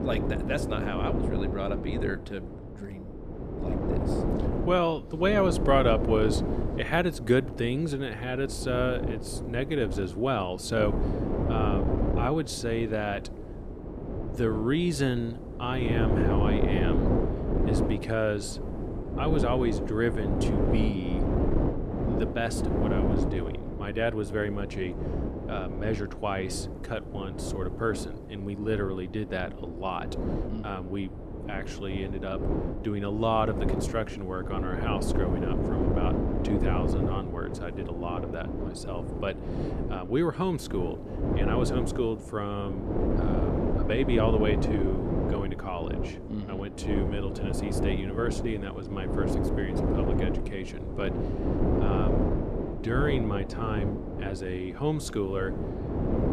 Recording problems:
wind noise on the microphone; heavy; 3 dB below the speech

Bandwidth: 13.5 kHz